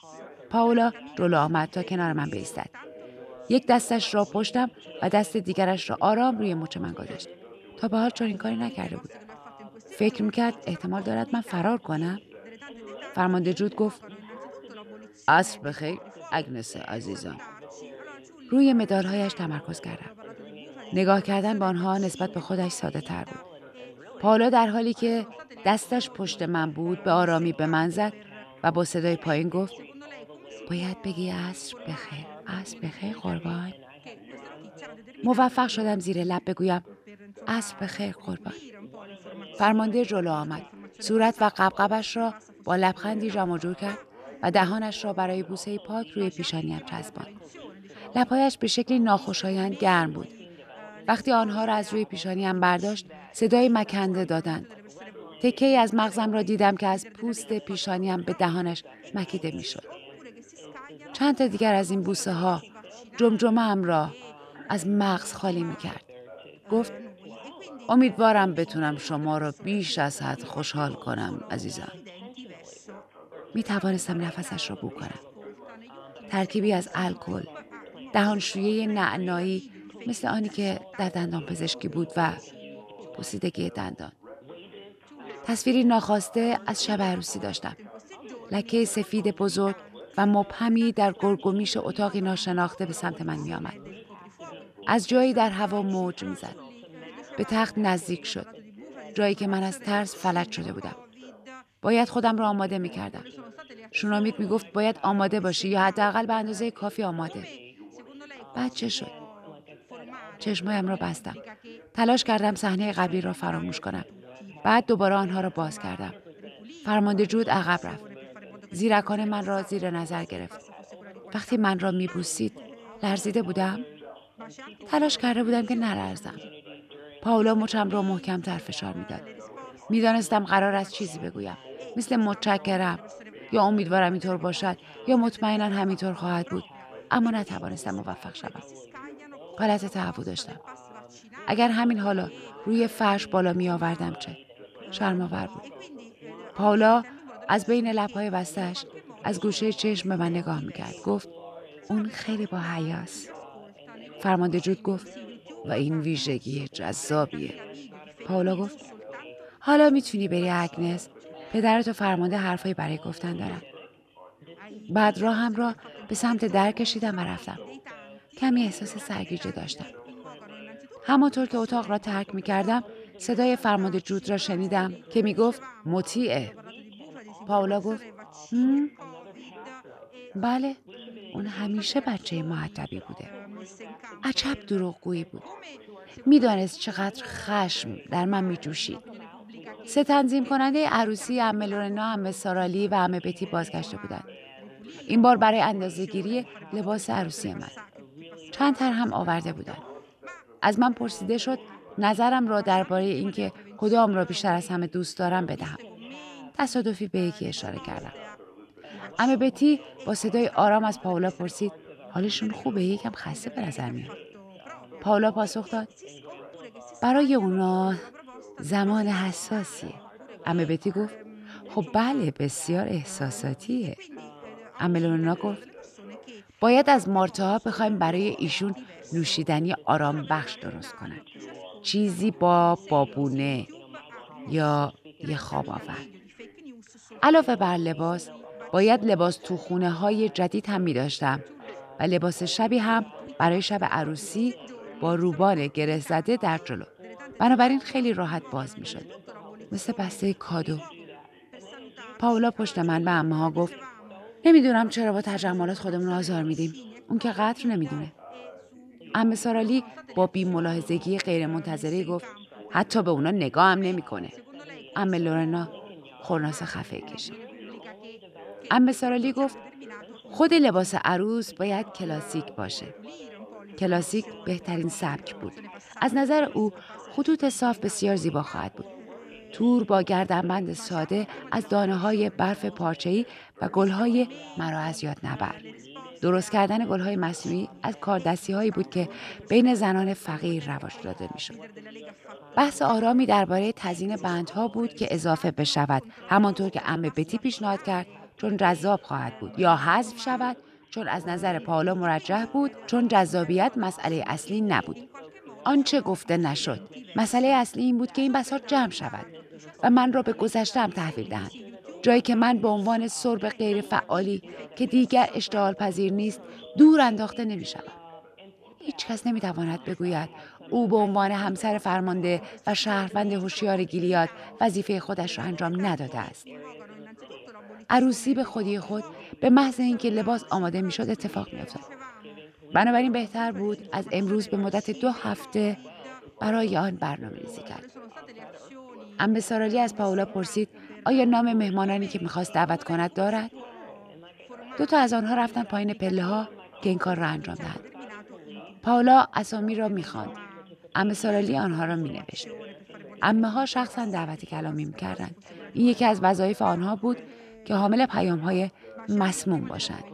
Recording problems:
background chatter; noticeable; throughout; 3 voices, 20 dB below the speech

